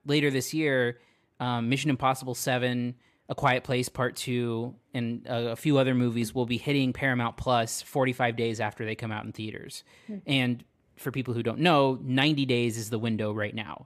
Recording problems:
none

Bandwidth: 14.5 kHz